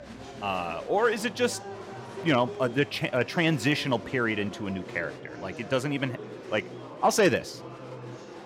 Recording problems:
murmuring crowd; noticeable; throughout; 15 dB below the speech

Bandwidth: 16.5 kHz